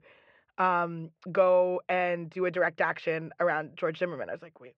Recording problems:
muffled; very; fading above 3 kHz

